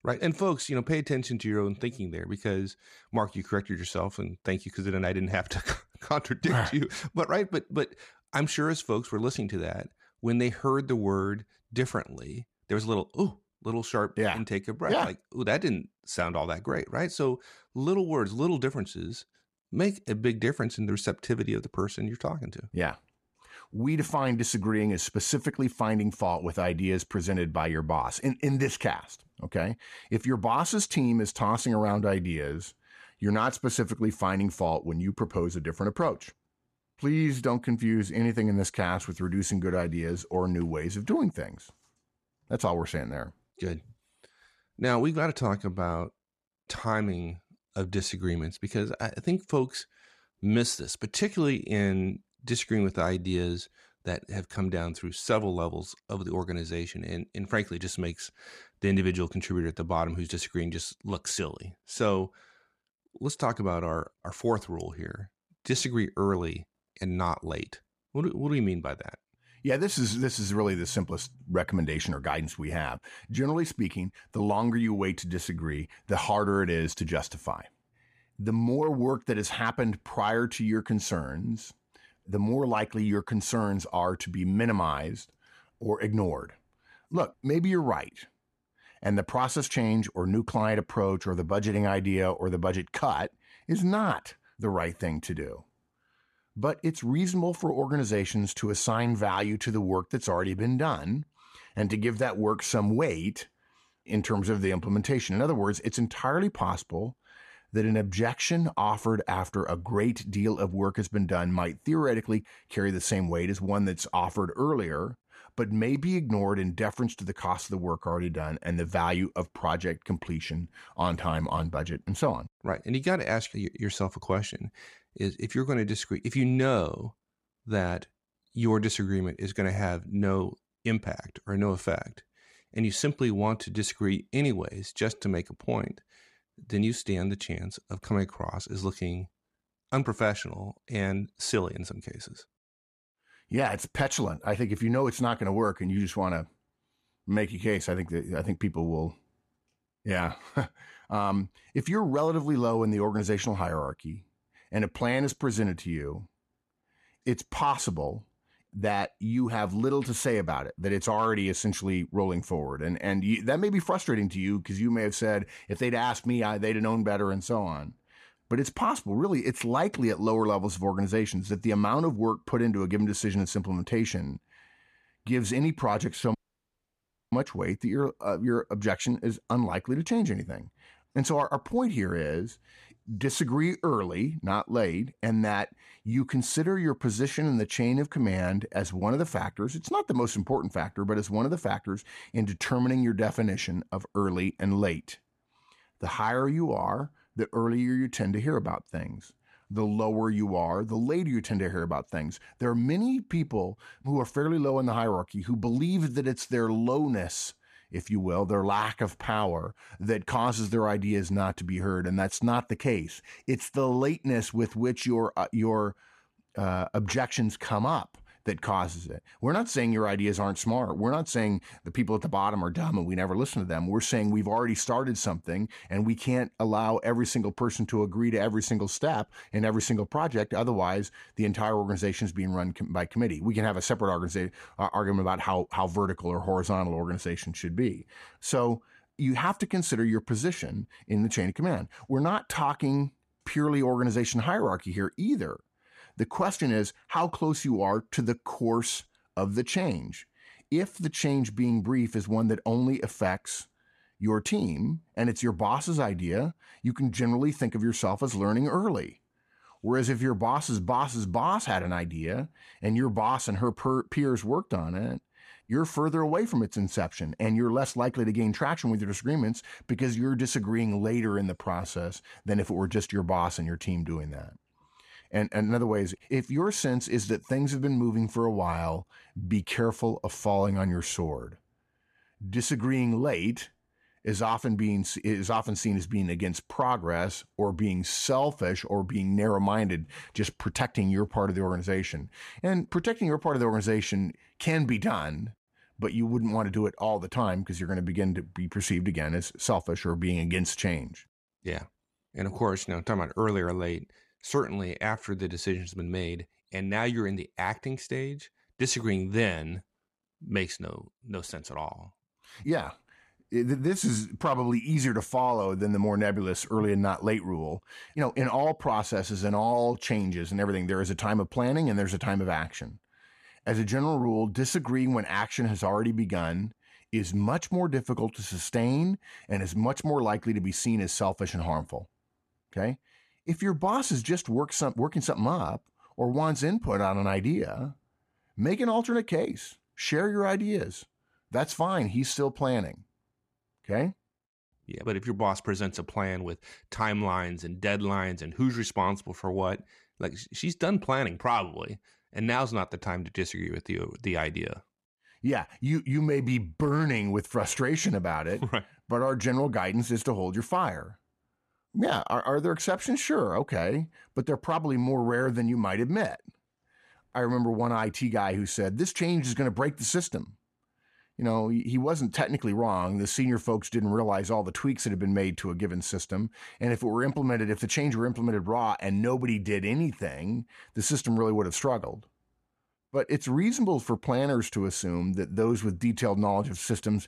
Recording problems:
audio cutting out; at 2:56 for 1 s

